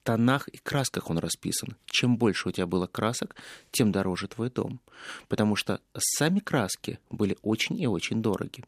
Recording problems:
none

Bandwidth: 14.5 kHz